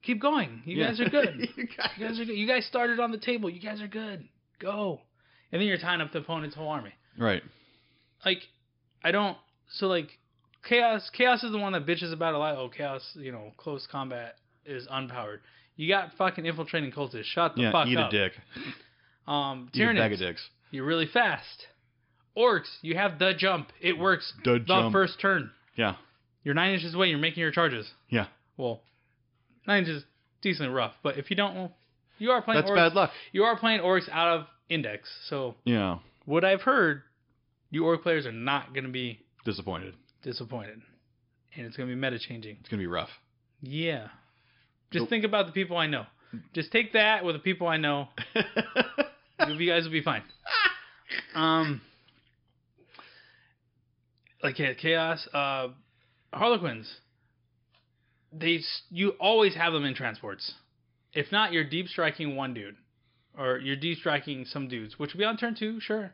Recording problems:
high frequencies cut off; noticeable; nothing above 5.5 kHz

